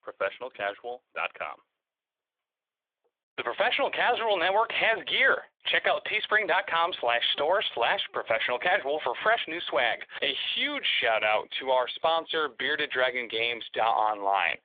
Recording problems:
phone-call audio; nothing above 3.5 kHz

